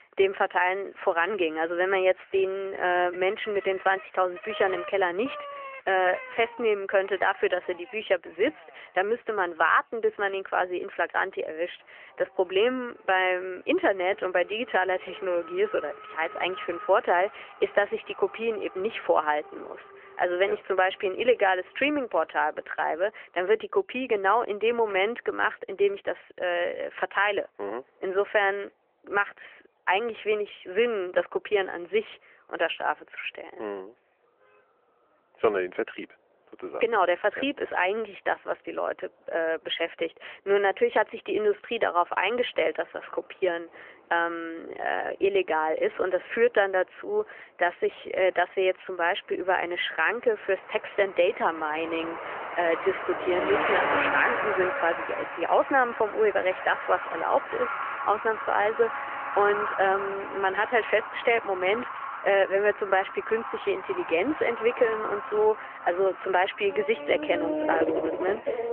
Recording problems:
phone-call audio; nothing above 3.5 kHz
traffic noise; loud; throughout; 7 dB below the speech

